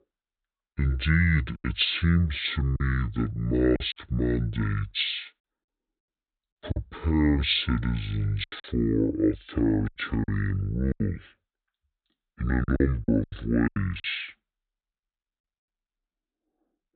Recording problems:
high frequencies cut off; severe; nothing above 4 kHz
wrong speed and pitch; too slow and too low; 0.6 times normal speed
choppy; very; 7% of the speech affected

